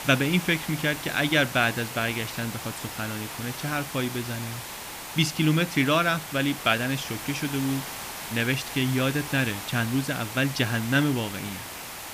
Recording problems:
hiss; loud; throughout; 9 dB below the speech

